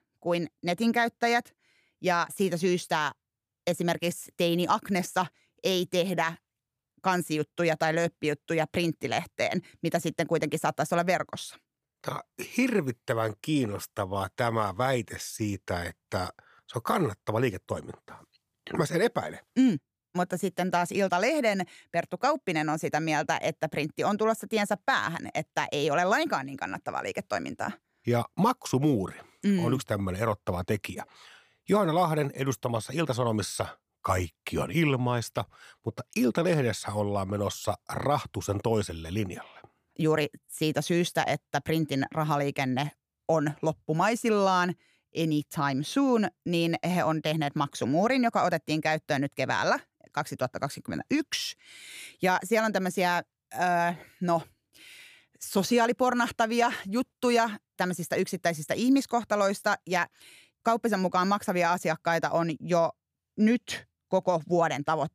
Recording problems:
none

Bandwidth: 15 kHz